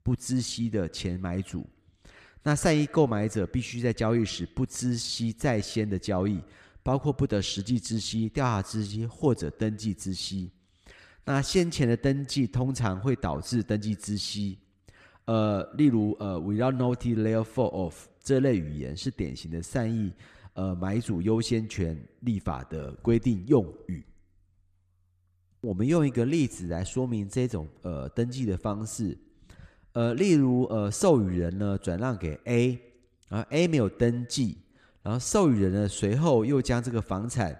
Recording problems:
echo of what is said; faint; throughout; 100 ms later, 25 dB below the speech

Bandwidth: 14.5 kHz